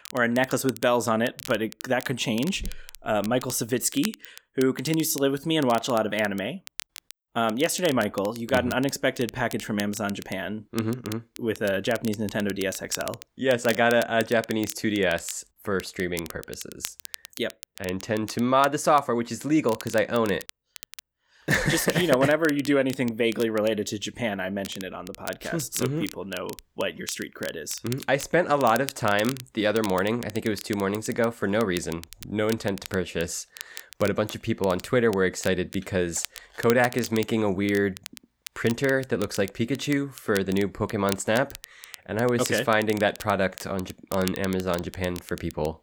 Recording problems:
crackle, like an old record; noticeable; 15 dB below the speech

